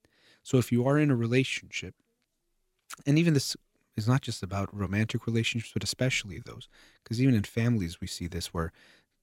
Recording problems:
none

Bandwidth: 16 kHz